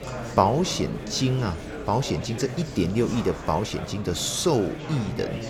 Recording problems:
murmuring crowd; loud; throughout; 9 dB below the speech

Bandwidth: 18 kHz